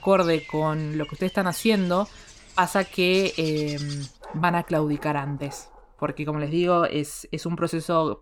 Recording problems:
animal sounds; noticeable; until 6 s; 15 dB below the speech

